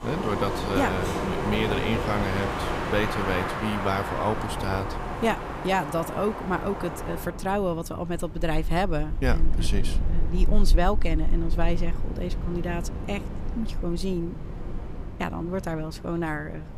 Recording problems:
wind in the background; loud; throughout; 2 dB below the speech

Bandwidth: 15 kHz